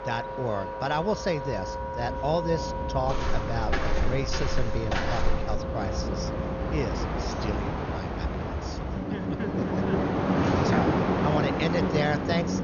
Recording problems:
garbled, watery; slightly; nothing above 6.5 kHz
train or aircraft noise; very loud; throughout; 2 dB above the speech
background music; loud; throughout; 5 dB below the speech
voice in the background; noticeable; throughout; 20 dB below the speech
footsteps; loud; from 3 to 5.5 s and at 10 s; peak 1 dB above the speech

